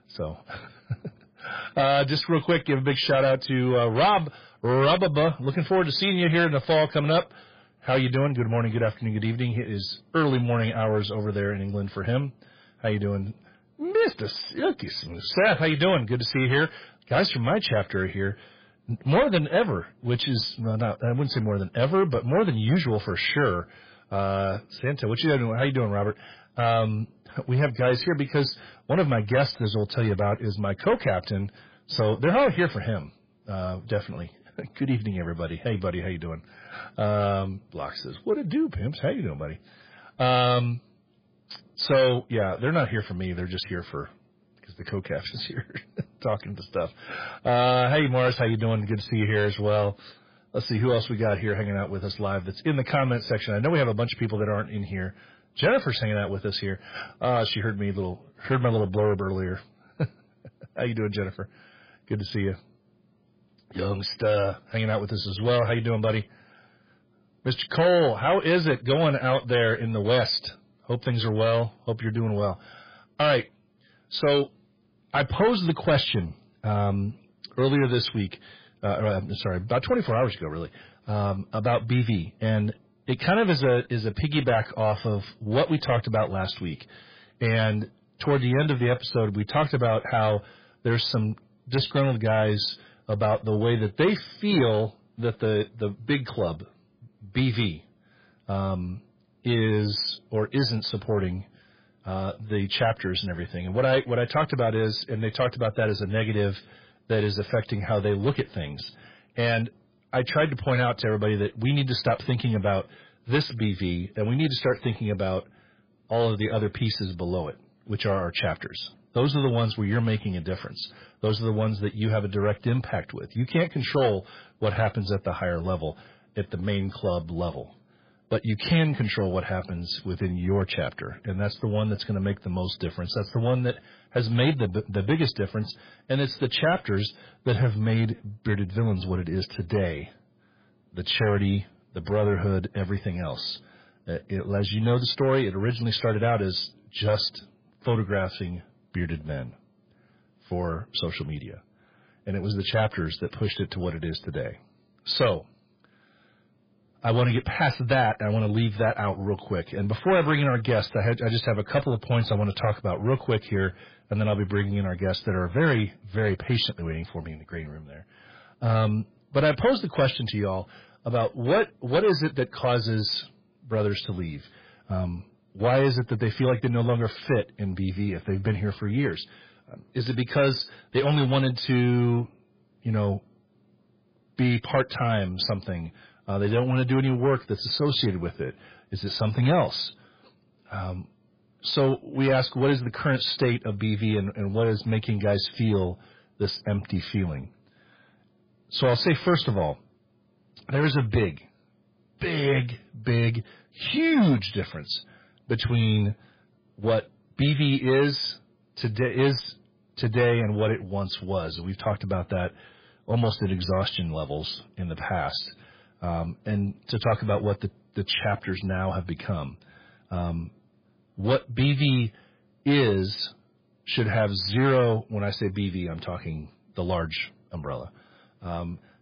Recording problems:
garbled, watery; badly; nothing above 5 kHz
distortion; slight; 10 dB below the speech

